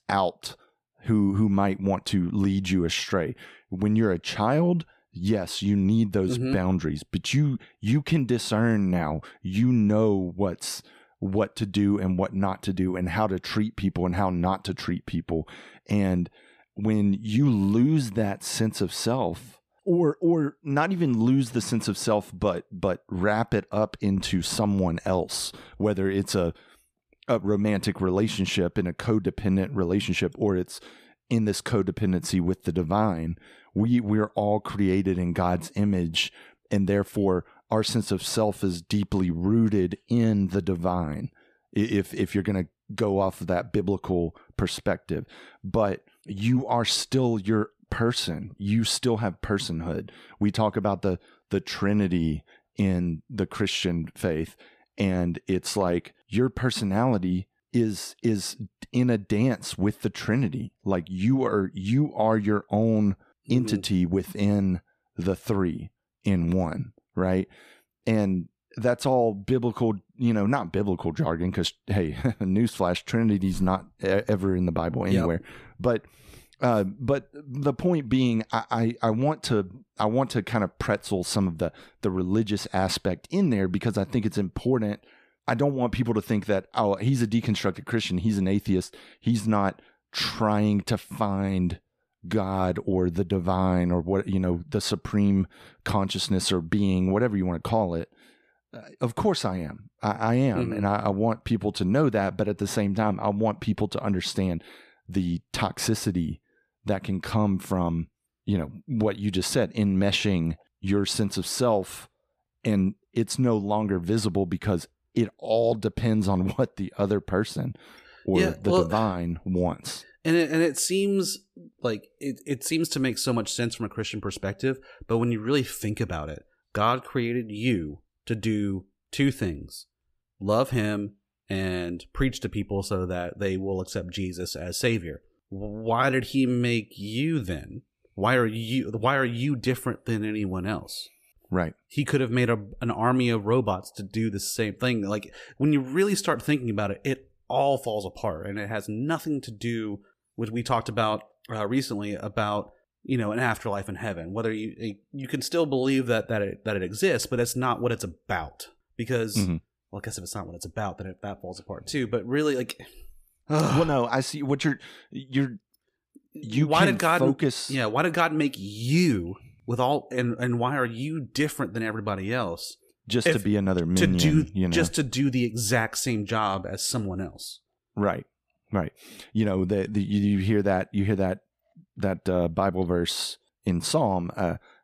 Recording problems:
none

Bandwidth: 14.5 kHz